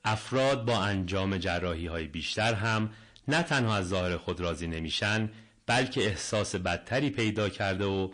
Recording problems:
distortion; heavy; 6 dB below the speech
garbled, watery; slightly; nothing above 9 kHz

